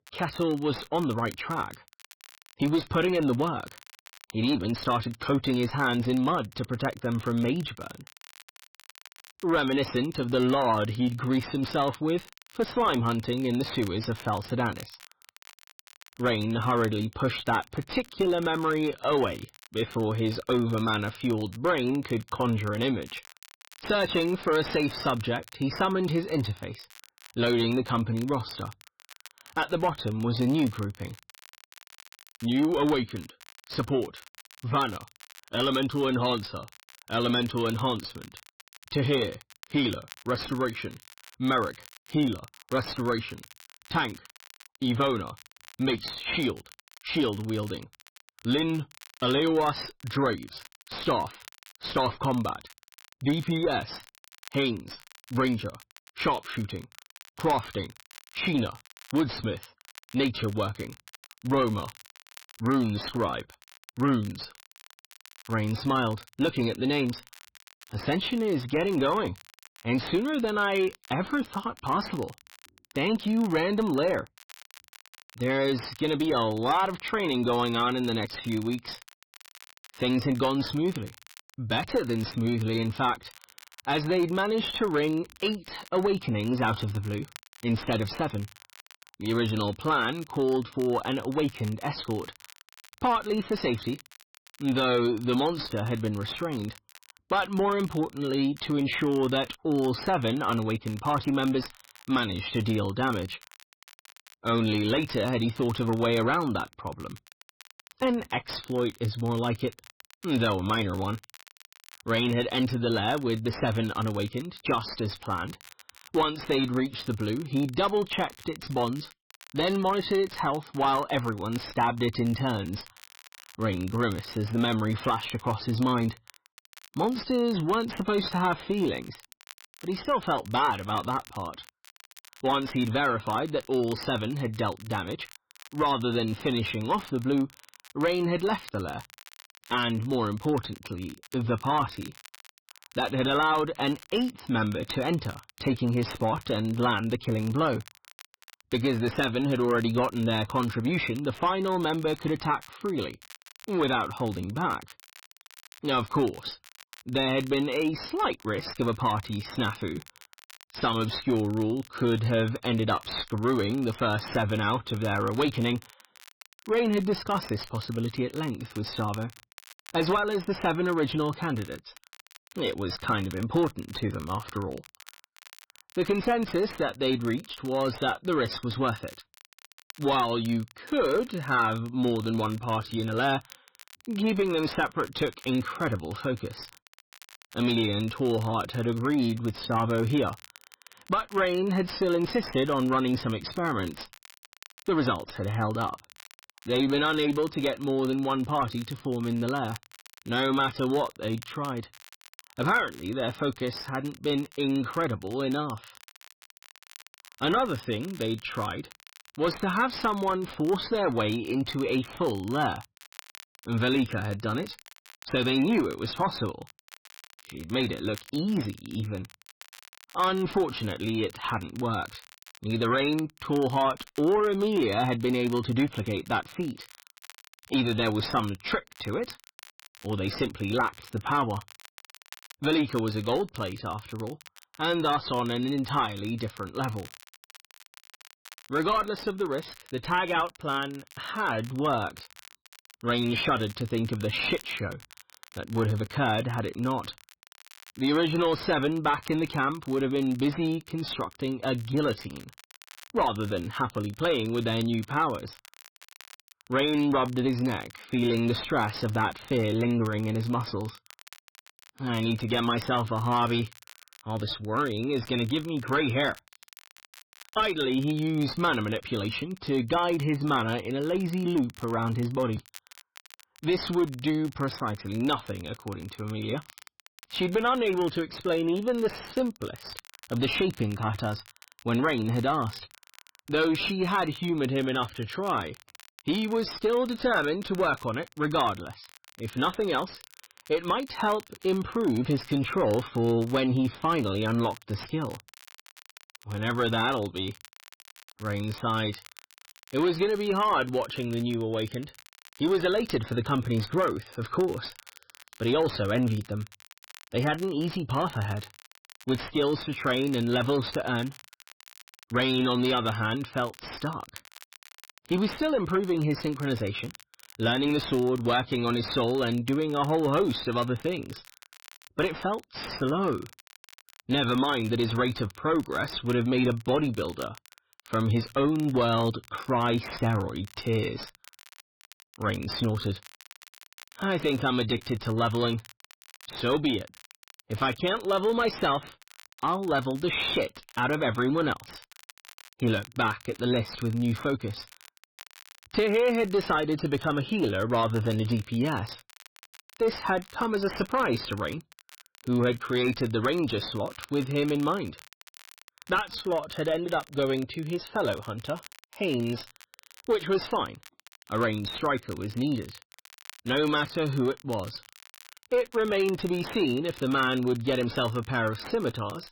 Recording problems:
garbled, watery; badly; nothing above 5.5 kHz
distortion; slight; 10 dB below the speech
crackle, like an old record; faint; 25 dB below the speech

